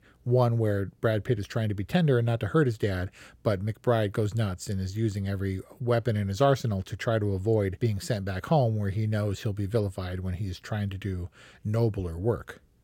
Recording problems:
none

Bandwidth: 16.5 kHz